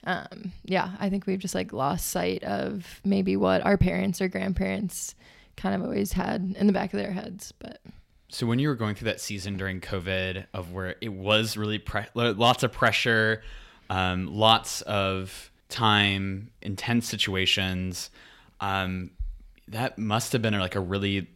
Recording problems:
none

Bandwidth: 16 kHz